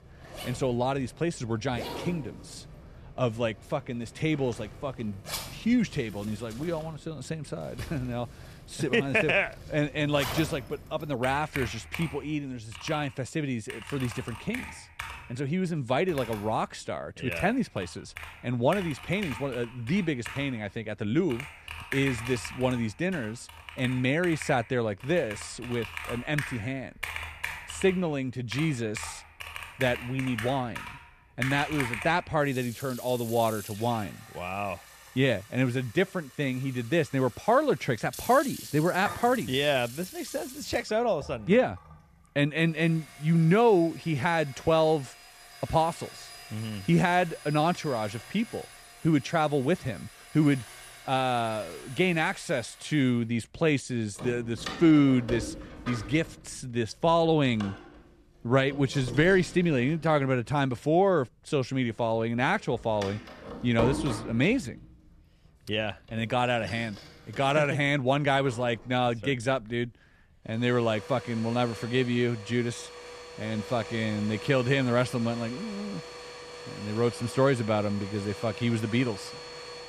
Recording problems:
household noises; noticeable; throughout; 15 dB below the speech

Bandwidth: 14 kHz